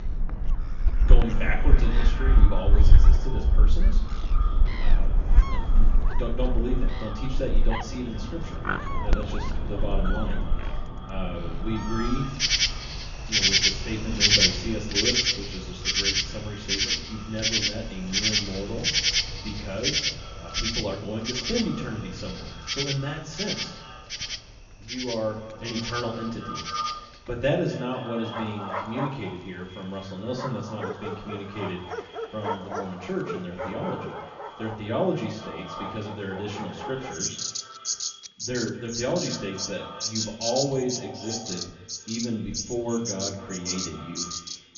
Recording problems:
echo of what is said; strong; throughout; 240 ms later, 10 dB below the speech
off-mic speech; far
high frequencies cut off; noticeable; nothing above 7 kHz
room echo; slight; dies away in 0.4 s
animal sounds; very loud; throughout; 6 dB above the speech
household noises; faint; from 25 s on; 25 dB below the speech

